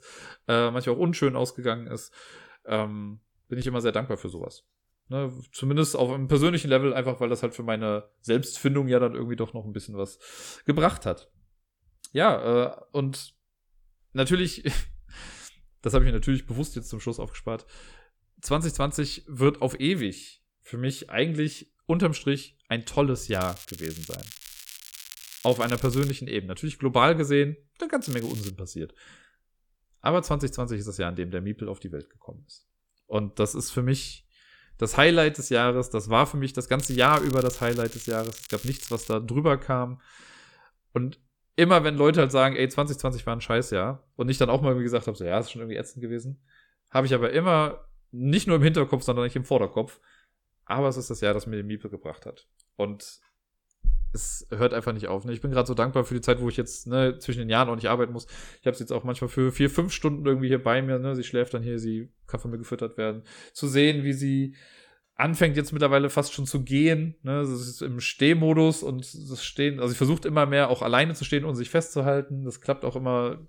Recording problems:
crackling; noticeable; from 23 to 26 s, at 28 s and from 37 to 39 s; 15 dB below the speech

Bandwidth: 18.5 kHz